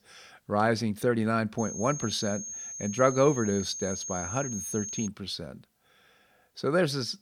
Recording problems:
high-pitched whine; loud; from 1.5 to 5 s; 6.5 kHz, 7 dB below the speech

